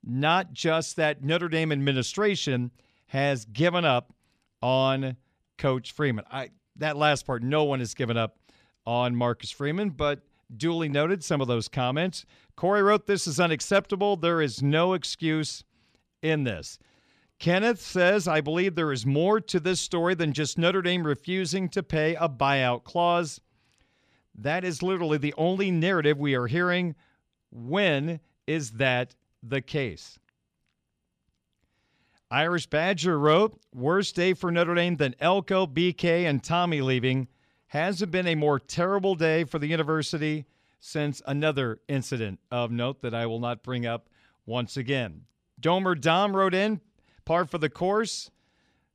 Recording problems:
none

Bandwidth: 14.5 kHz